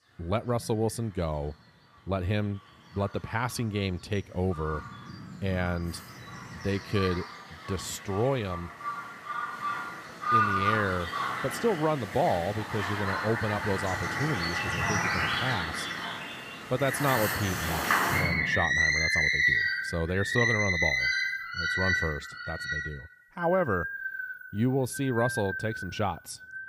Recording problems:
animal sounds; very loud; throughout; 2 dB above the speech

